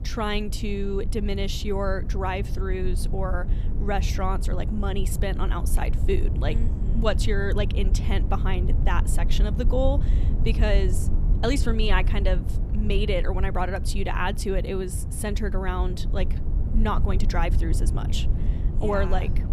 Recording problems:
low rumble; noticeable; throughout; 10 dB below the speech

